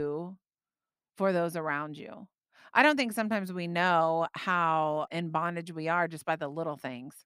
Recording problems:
abrupt cut into speech; at the start

